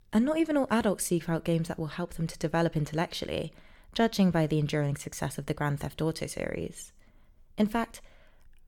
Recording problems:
none

